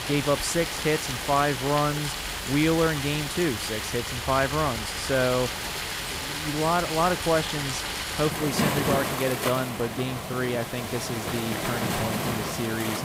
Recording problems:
rain or running water; loud; throughout; 2 dB below the speech
hiss; noticeable; throughout; 15 dB below the speech

